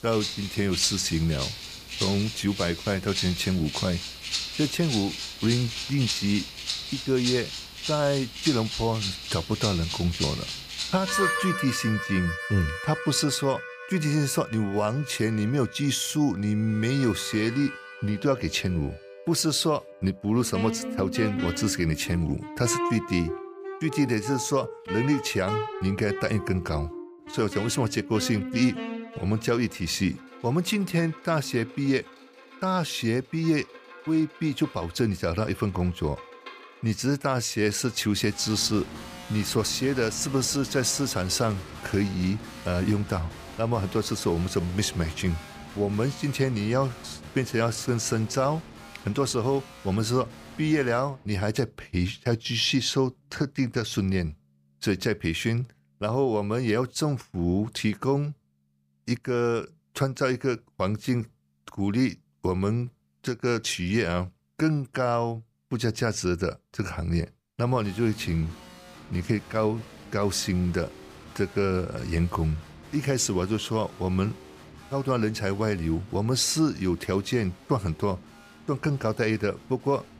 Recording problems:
background music; loud; throughout; 8 dB below the speech

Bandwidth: 15 kHz